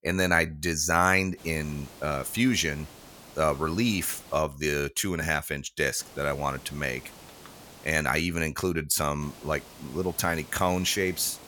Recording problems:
hiss; faint; from 1.5 to 4.5 s, from 6 to 8 s and from 9 s on; 20 dB below the speech

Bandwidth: 18 kHz